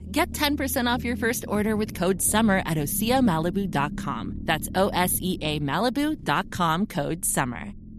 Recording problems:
low rumble; noticeable; throughout; 20 dB below the speech

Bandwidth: 13.5 kHz